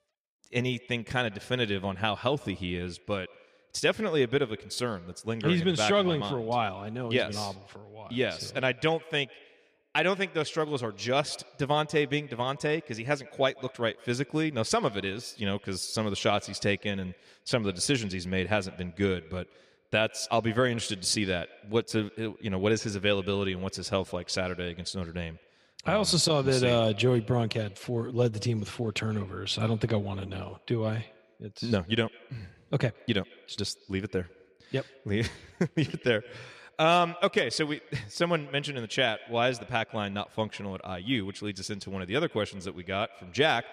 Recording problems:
echo of what is said; faint; throughout; 150 ms later, 25 dB below the speech

